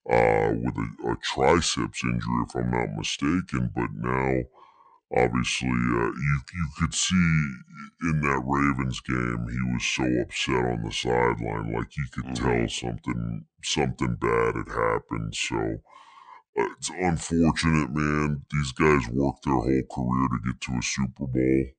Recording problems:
wrong speed and pitch; too slow and too low; 0.7 times normal speed

